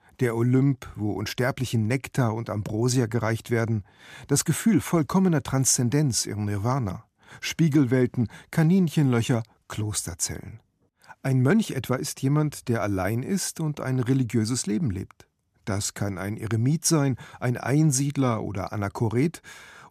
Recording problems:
none

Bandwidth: 14.5 kHz